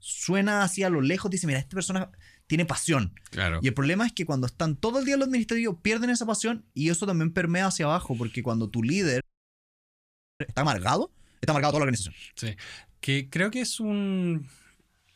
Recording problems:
audio freezing; at 9 s for 1 s

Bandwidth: 14.5 kHz